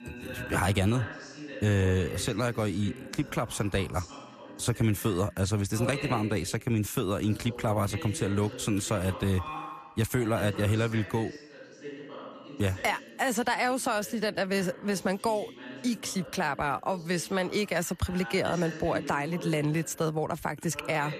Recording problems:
voice in the background; noticeable; throughout; 15 dB below the speech

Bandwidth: 14.5 kHz